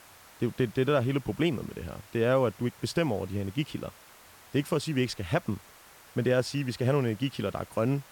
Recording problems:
hiss; faint; throughout; 20 dB below the speech

